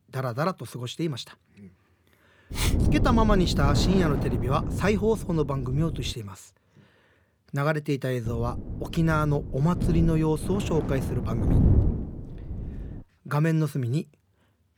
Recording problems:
wind noise on the microphone; heavy; from 2.5 to 6 s and from 8.5 to 13 s; 8 dB below the speech

